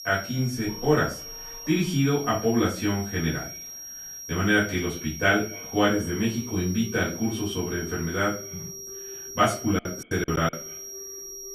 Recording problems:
off-mic speech; far
echo of what is said; faint; throughout; 130 ms later, 25 dB below the speech
room echo; slight; dies away in 0.3 s
high-pitched whine; noticeable; throughout; 5.5 kHz, 10 dB below the speech
alarms or sirens; faint; throughout; 20 dB below the speech
choppy; very; at 10 s; 24% of the speech affected

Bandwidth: 13.5 kHz